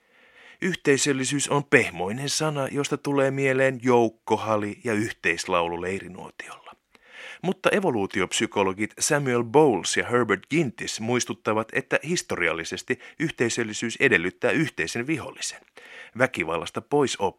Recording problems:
thin; very slightly; fading below 700 Hz

